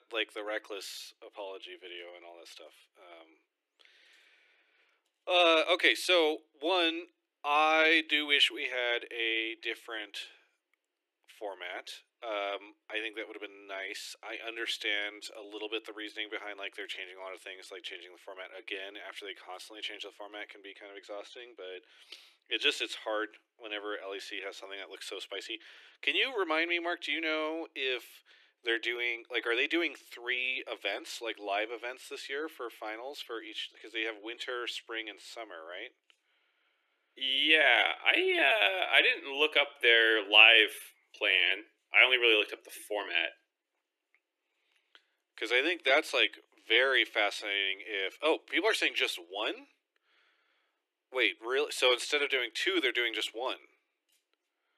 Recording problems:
thin; very; fading below 300 Hz

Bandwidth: 13.5 kHz